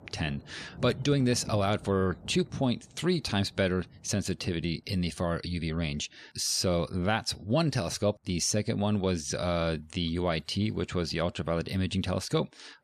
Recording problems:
rain or running water; noticeable; throughout; 20 dB below the speech

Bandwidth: 14.5 kHz